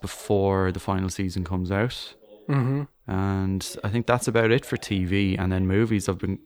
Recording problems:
voice in the background; faint; throughout; 25 dB below the speech

